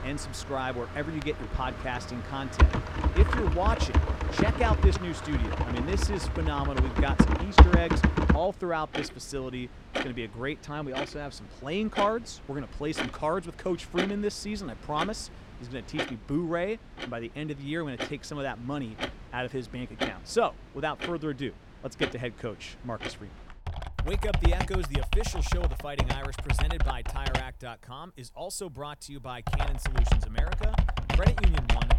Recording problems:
household noises; very loud; throughout; 5 dB above the speech

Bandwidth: 17.5 kHz